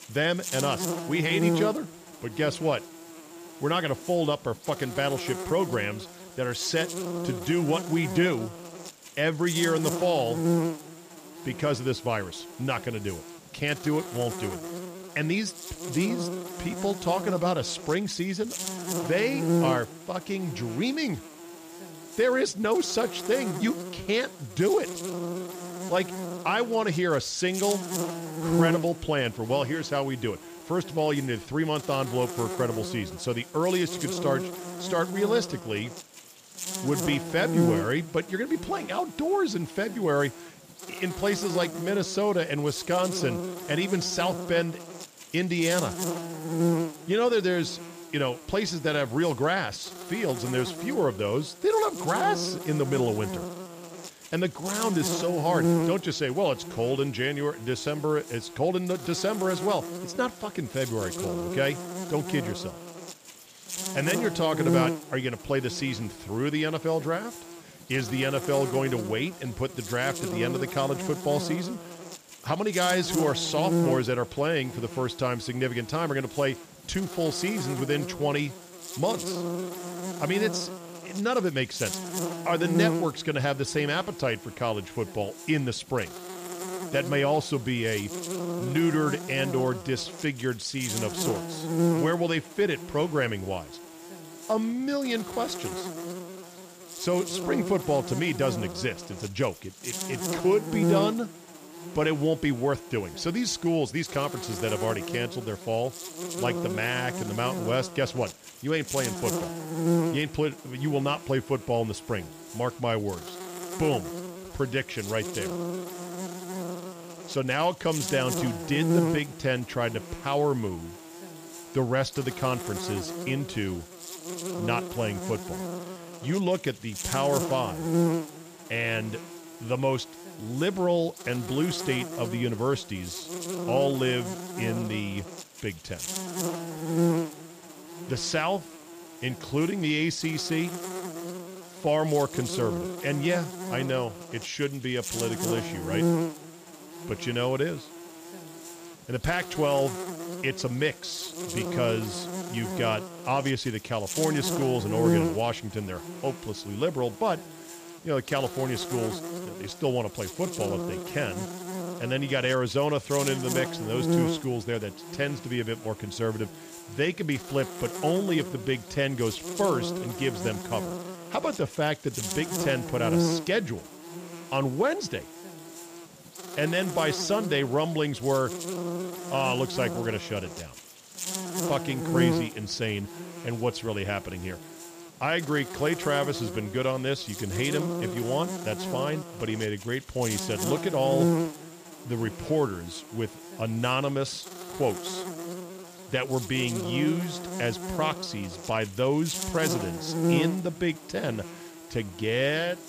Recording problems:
electrical hum; loud; throughout; 60 Hz, 8 dB below the speech

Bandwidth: 15 kHz